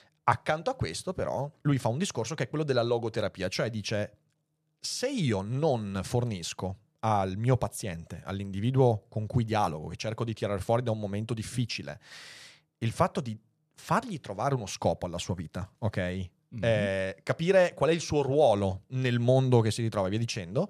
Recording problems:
none

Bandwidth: 14.5 kHz